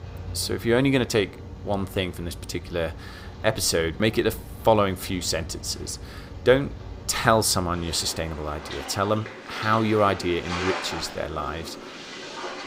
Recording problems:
rain or running water; noticeable; throughout; 10 dB below the speech

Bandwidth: 15.5 kHz